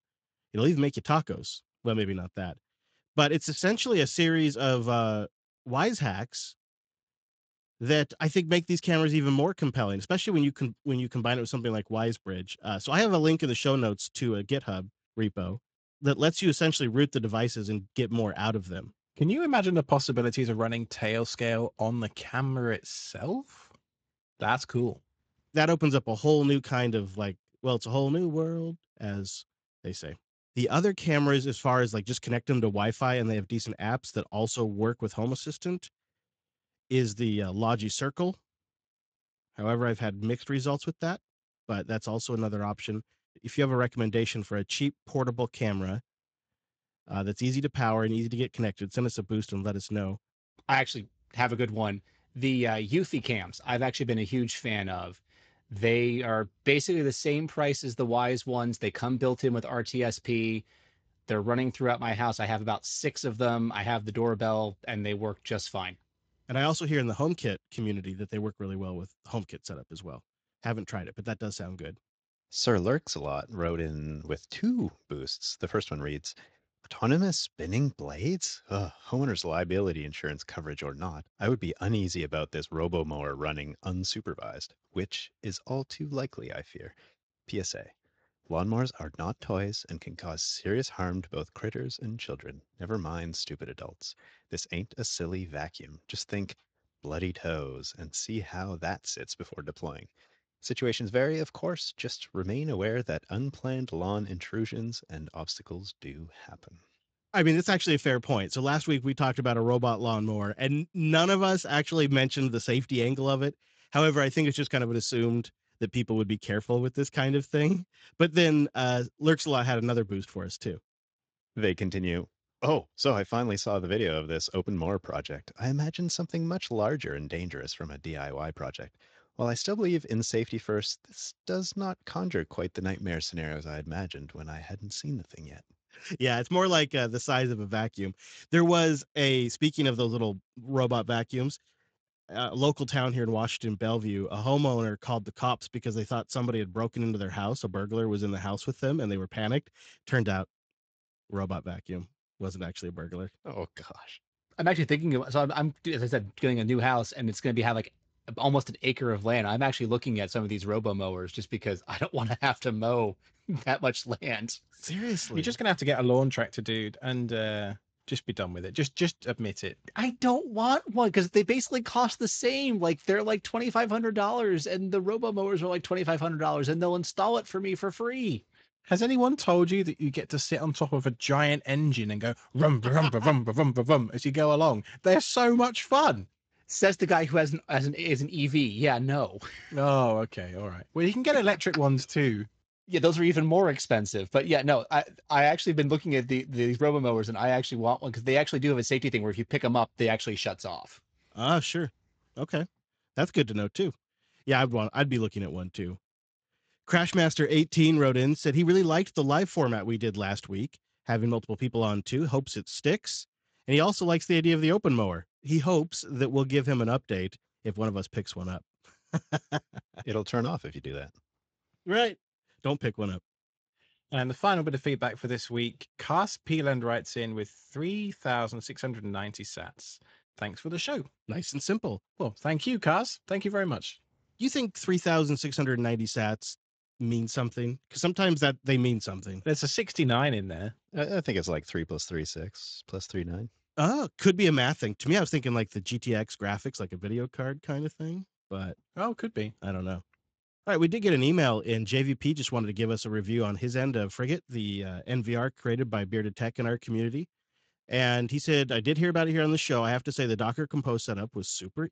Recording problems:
garbled, watery; slightly; nothing above 7.5 kHz

